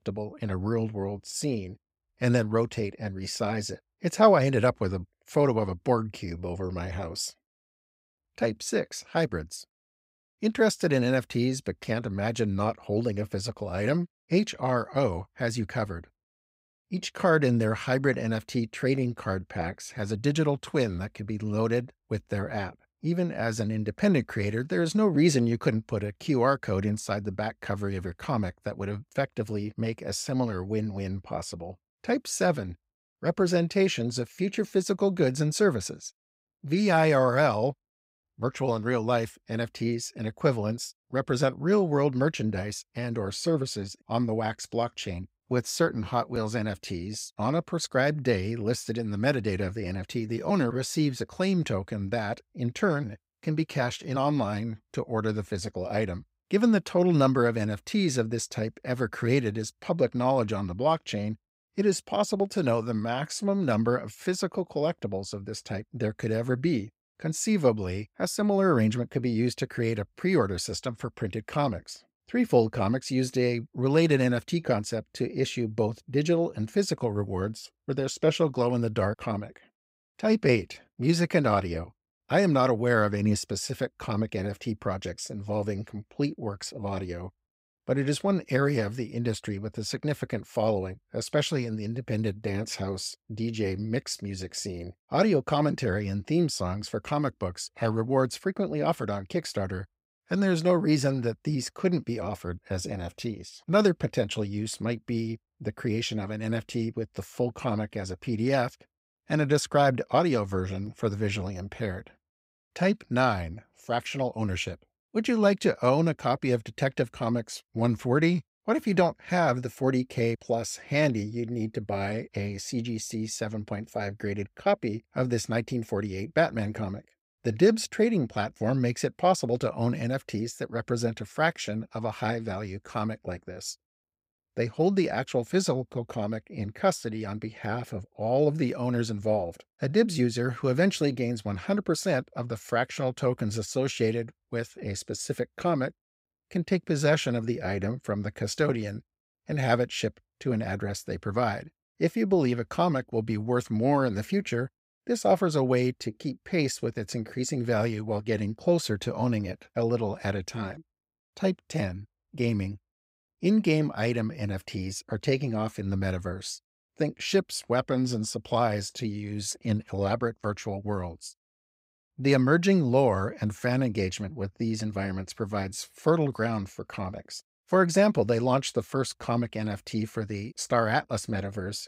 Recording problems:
none

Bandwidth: 15.5 kHz